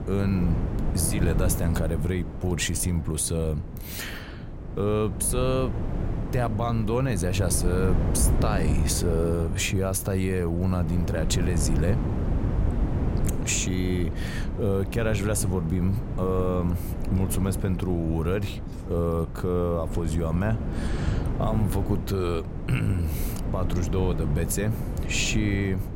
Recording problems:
wind noise on the microphone; heavy; 8 dB below the speech

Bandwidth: 16 kHz